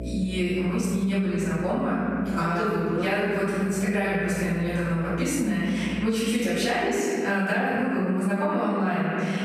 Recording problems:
room echo; strong; dies away in 1.5 s
off-mic speech; far
squashed, flat; somewhat
electrical hum; faint; until 7 s; 60 Hz, 25 dB below the speech

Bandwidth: 14 kHz